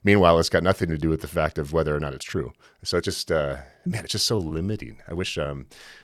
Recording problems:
uneven, jittery; strongly; from 1 to 5.5 s

